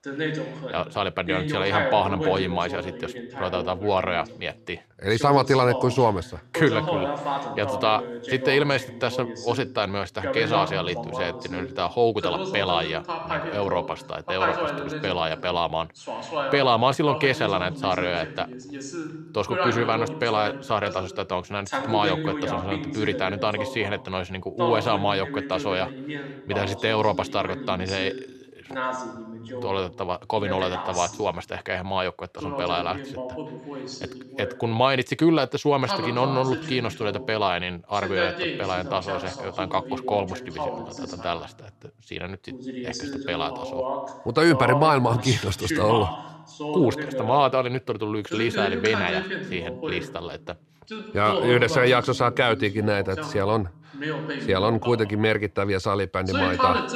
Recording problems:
voice in the background; loud; throughout; 6 dB below the speech

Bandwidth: 14 kHz